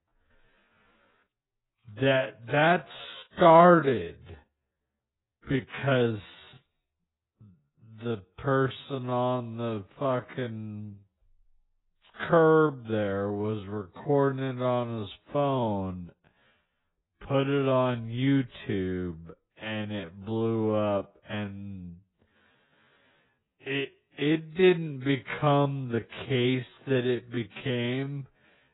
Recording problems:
garbled, watery; badly; nothing above 4 kHz
wrong speed, natural pitch; too slow; 0.5 times normal speed

